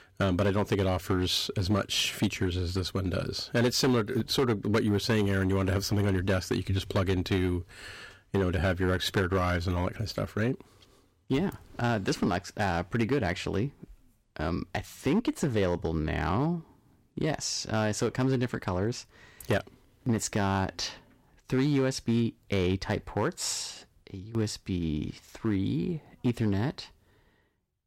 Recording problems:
distortion; slight; 5% of the sound clipped

